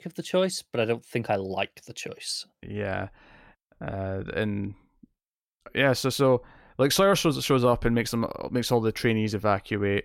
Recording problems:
none

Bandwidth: 16.5 kHz